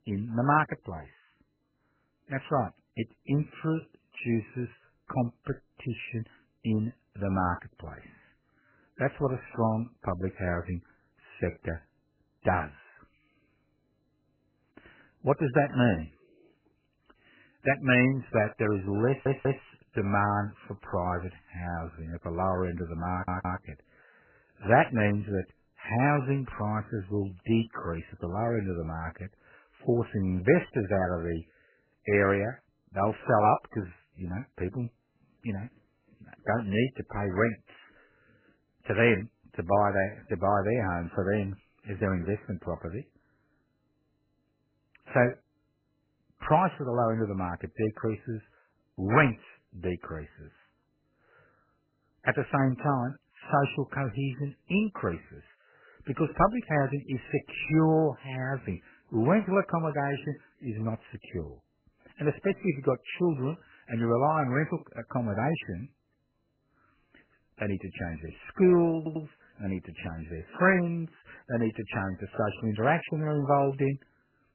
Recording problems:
garbled, watery; badly; nothing above 3 kHz
audio stuttering; at 19 s, at 23 s and at 1:09

